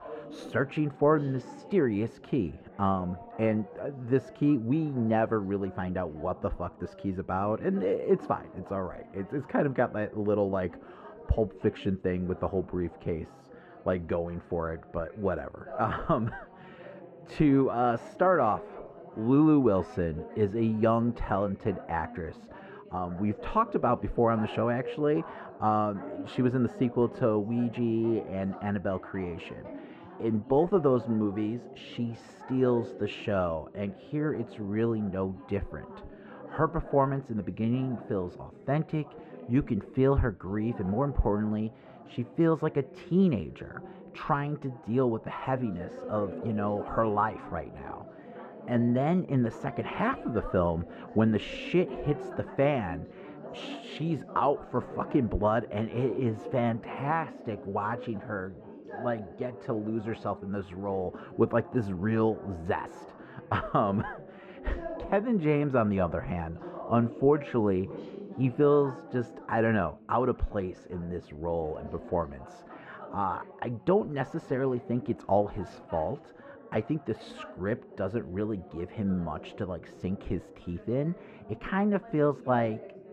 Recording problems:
muffled; very; fading above 3.5 kHz
background chatter; noticeable; throughout; 3 voices, 15 dB below the speech

